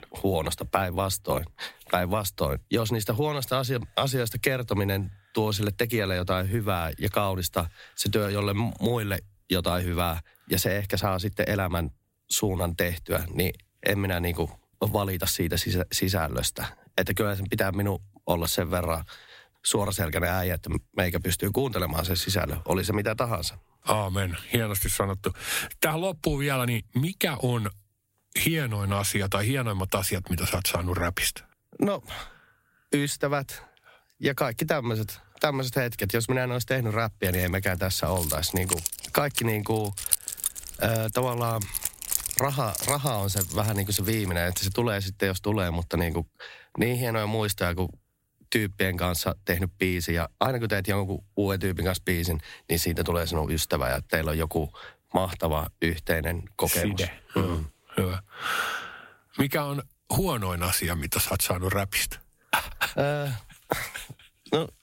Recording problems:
squashed, flat; somewhat
jangling keys; loud; from 37 to 45 s; peak 3 dB above the speech

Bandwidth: 16 kHz